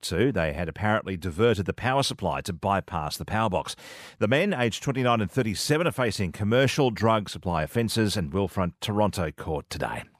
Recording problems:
none

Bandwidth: 15 kHz